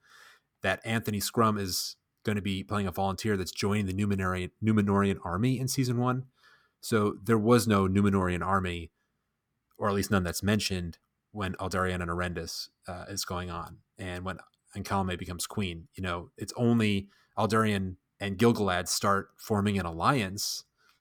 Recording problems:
none

